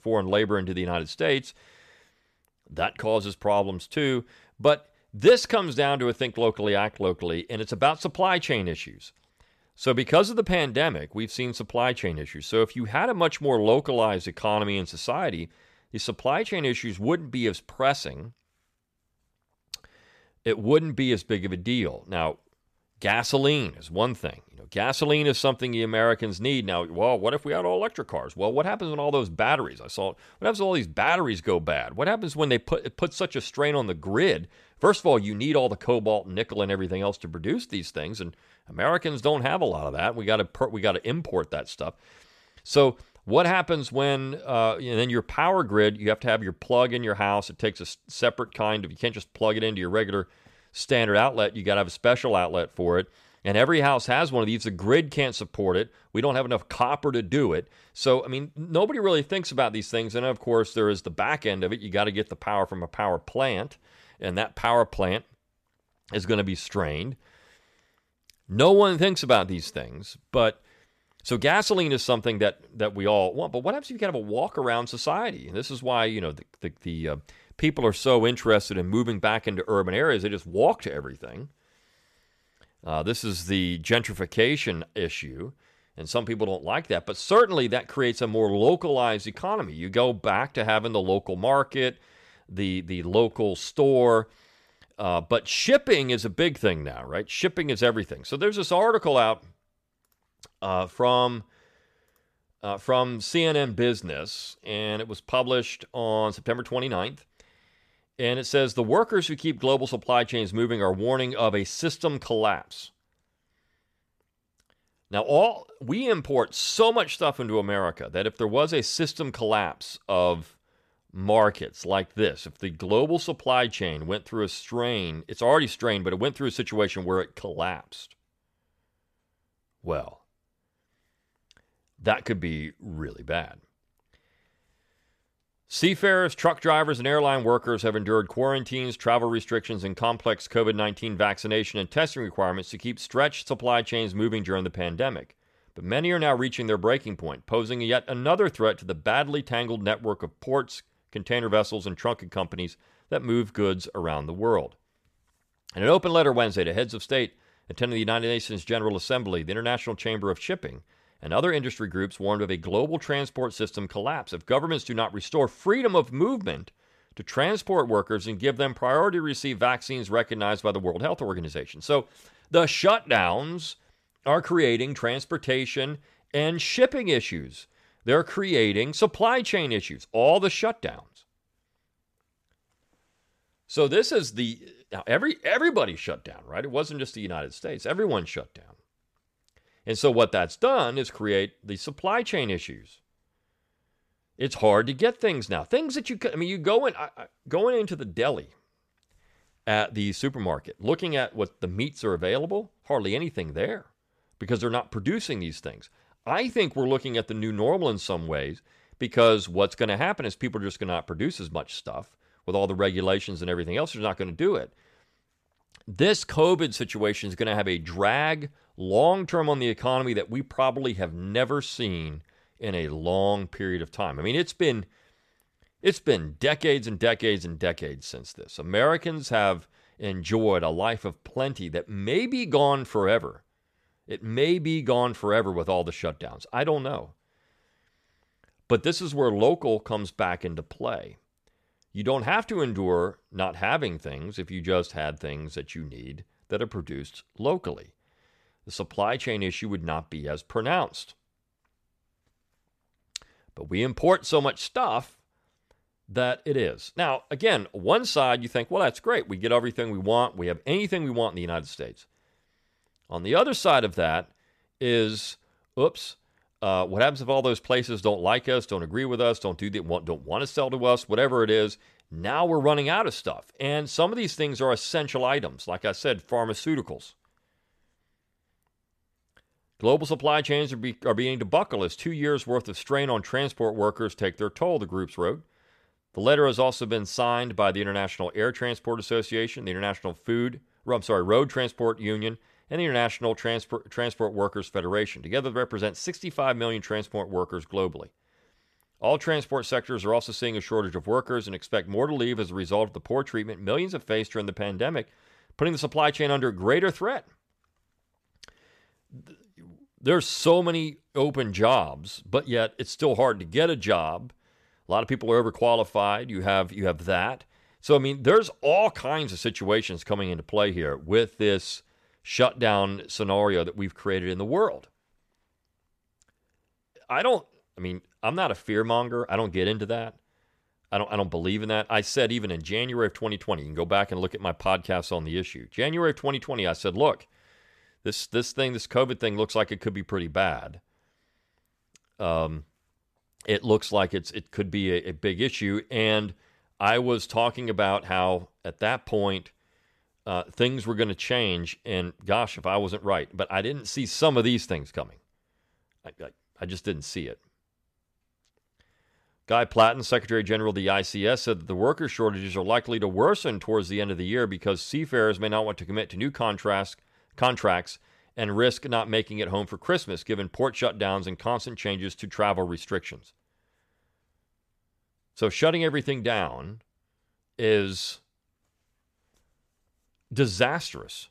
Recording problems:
none

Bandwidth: 14.5 kHz